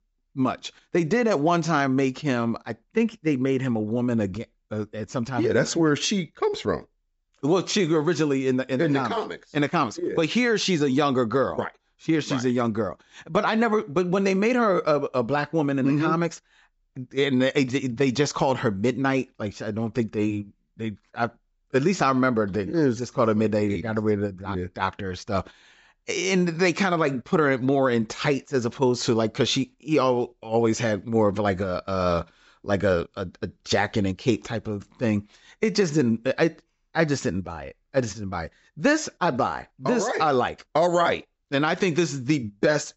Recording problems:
high frequencies cut off; noticeable; nothing above 7.5 kHz

